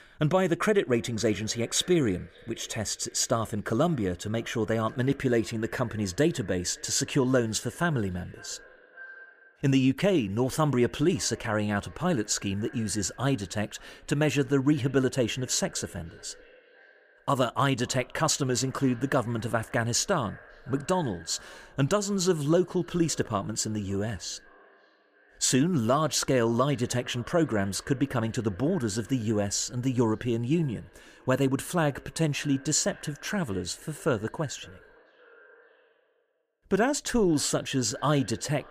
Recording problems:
echo of what is said; faint; throughout; 560 ms later, 25 dB below the speech

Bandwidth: 15 kHz